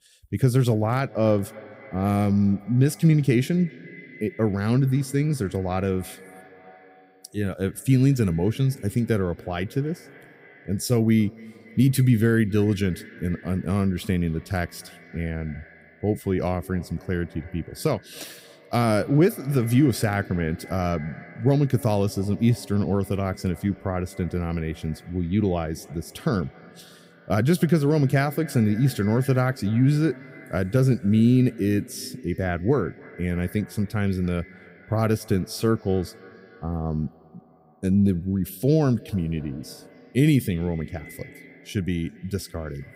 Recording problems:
echo of what is said; faint; throughout; 270 ms later, 20 dB below the speech

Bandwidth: 15.5 kHz